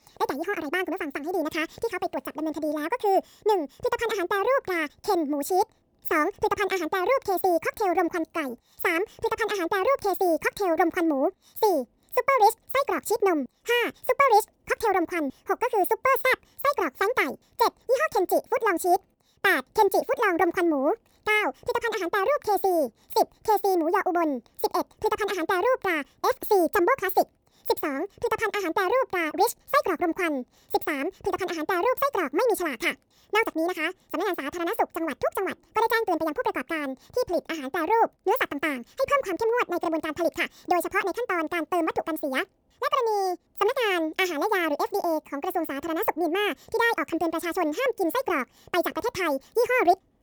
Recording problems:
wrong speed and pitch; too fast and too high; 1.7 times normal speed

